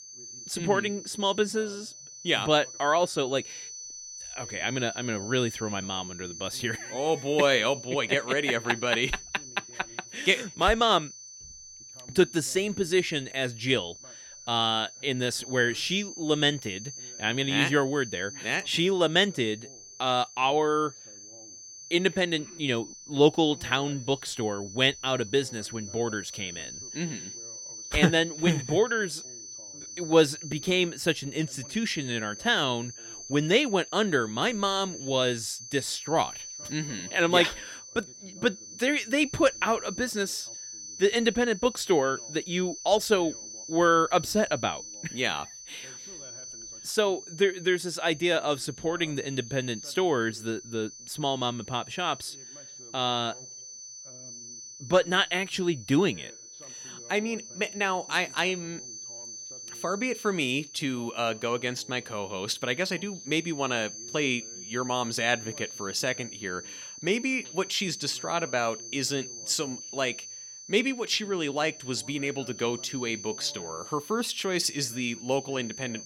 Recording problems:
high-pitched whine; noticeable; throughout; 6 kHz, 15 dB below the speech
voice in the background; faint; throughout; 30 dB below the speech

